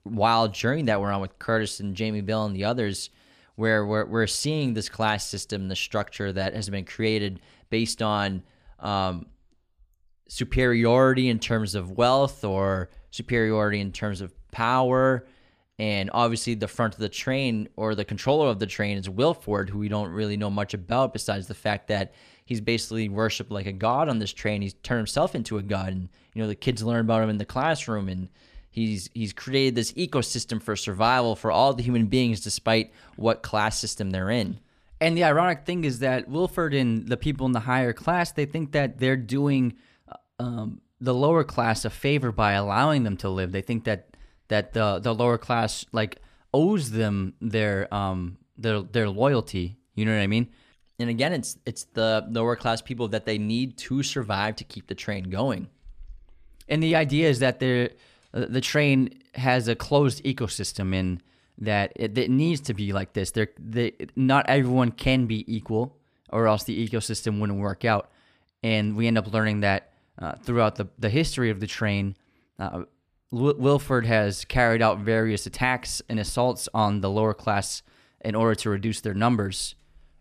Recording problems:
none

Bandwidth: 14.5 kHz